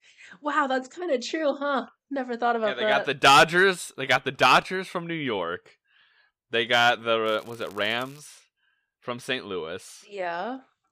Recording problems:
crackling; faint; at 7.5 s; 30 dB below the speech

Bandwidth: 15 kHz